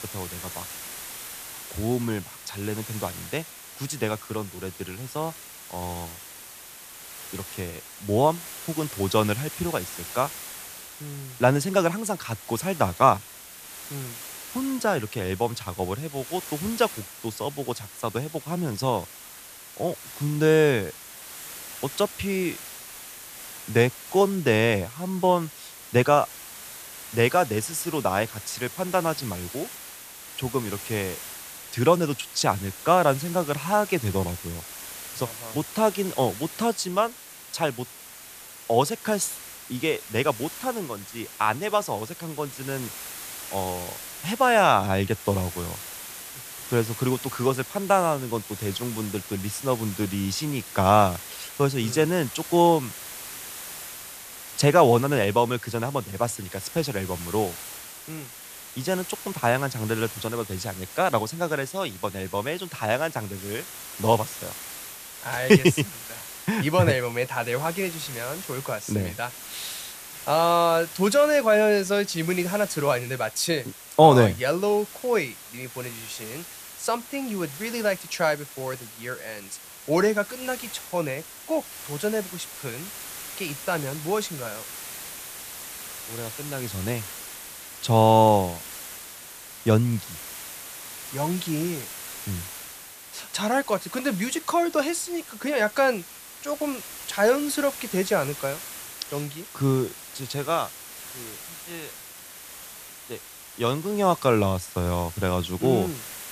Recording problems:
hiss; noticeable; throughout; 10 dB below the speech

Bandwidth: 14.5 kHz